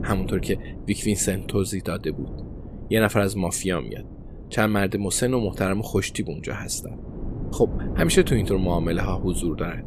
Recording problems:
wind noise on the microphone; occasional gusts; 15 dB below the speech

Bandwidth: 15 kHz